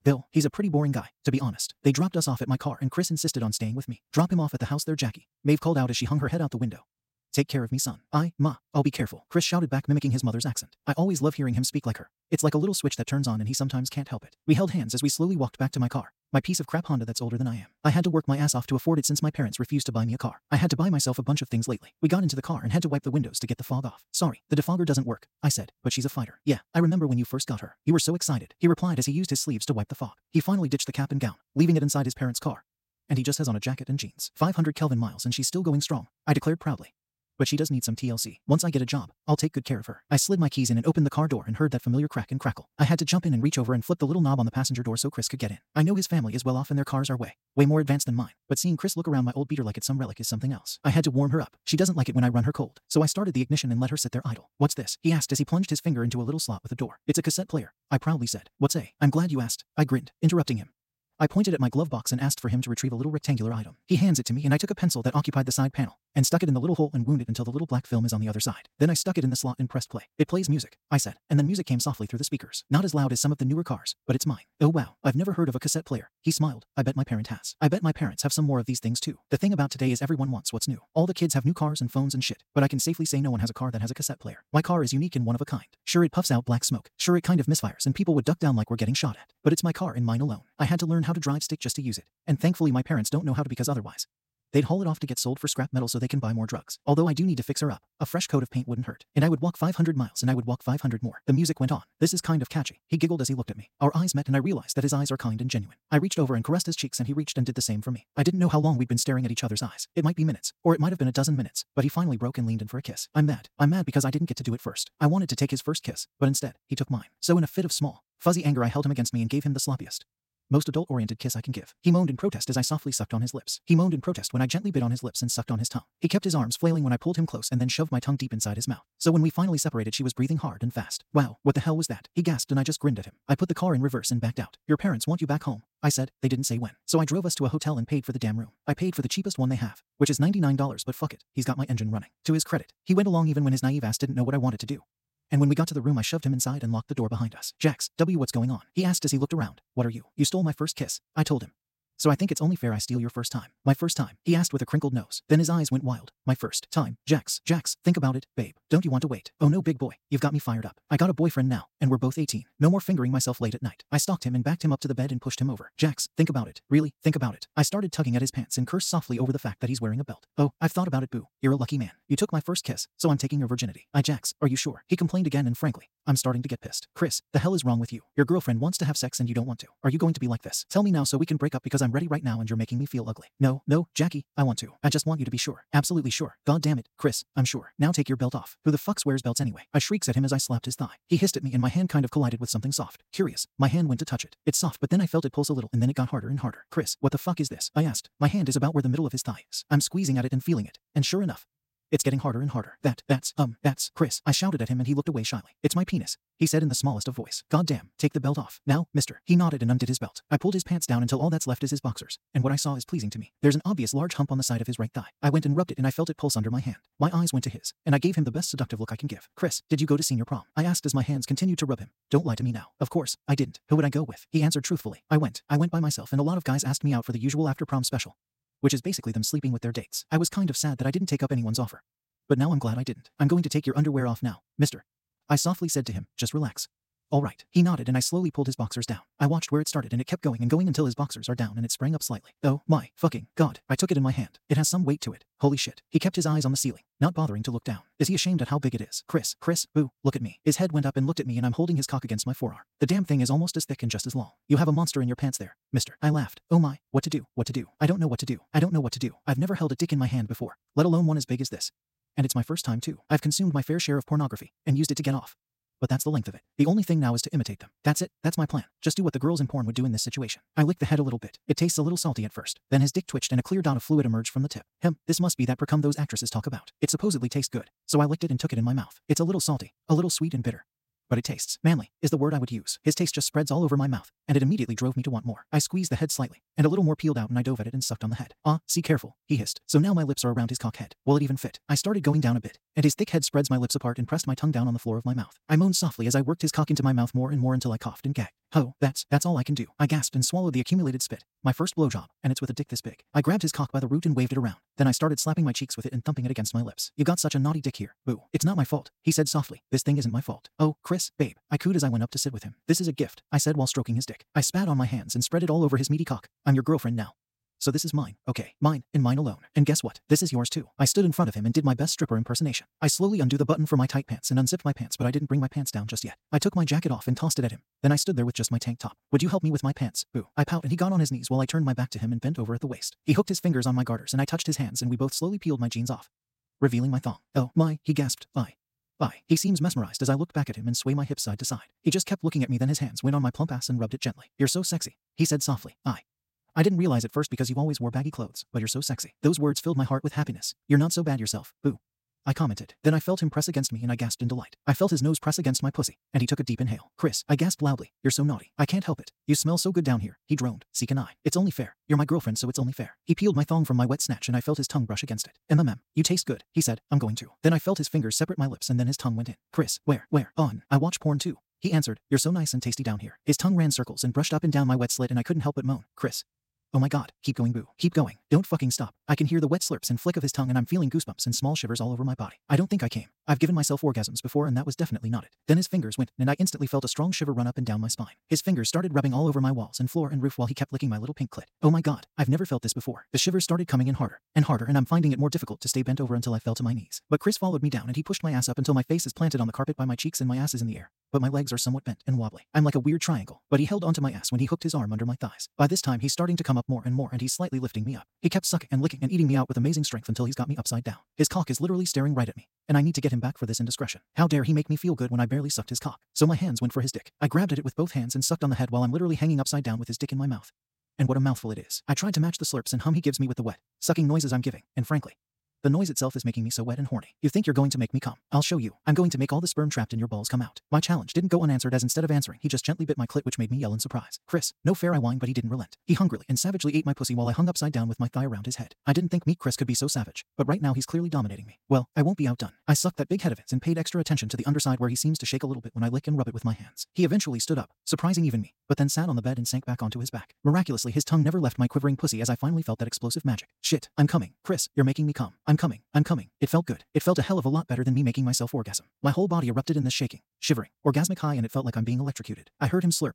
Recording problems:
wrong speed, natural pitch; too fast; 1.7 times normal speed

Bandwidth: 16 kHz